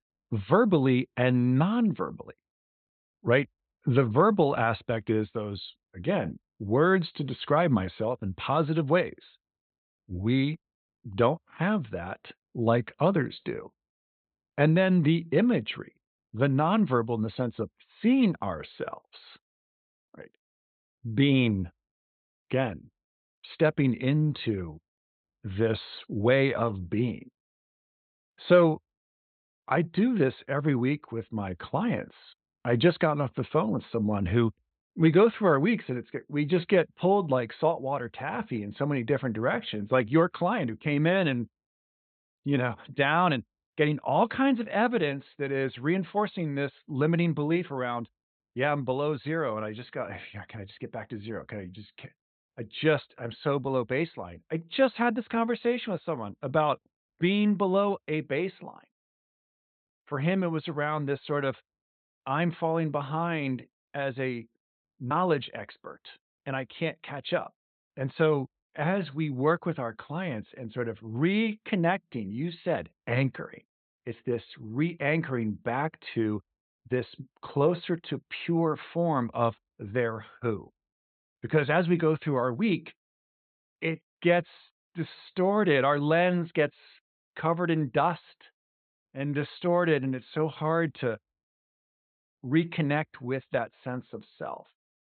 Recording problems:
high frequencies cut off; severe; nothing above 4 kHz

